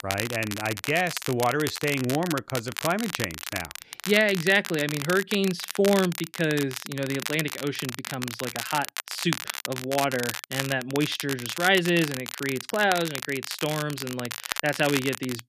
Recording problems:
crackle, like an old record; loud; 7 dB below the speech

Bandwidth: 14.5 kHz